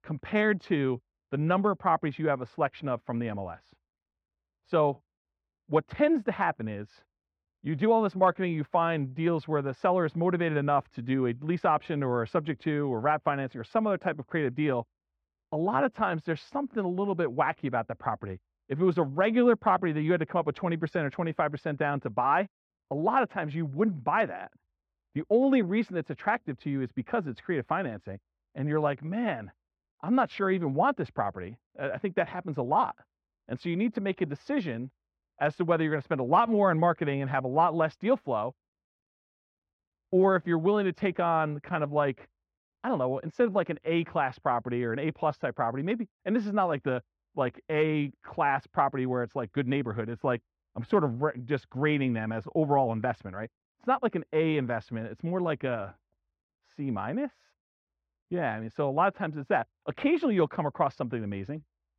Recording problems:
muffled; very; fading above 4 kHz

